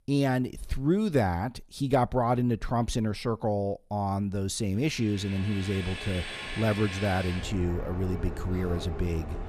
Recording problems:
train or aircraft noise; loud; from 5.5 s on; 9 dB below the speech

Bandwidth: 14.5 kHz